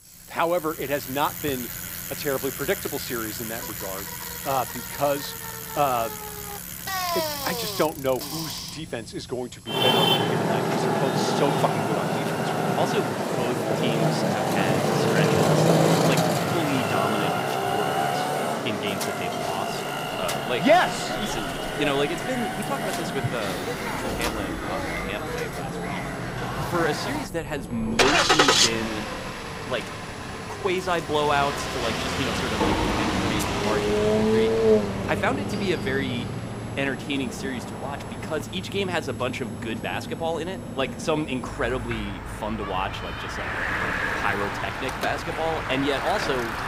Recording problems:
traffic noise; very loud; throughout; 3 dB above the speech
household noises; loud; throughout; 10 dB below the speech
high-pitched whine; faint; until 14 s and from 21 to 42 s; 11 kHz, 20 dB below the speech

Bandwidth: 15.5 kHz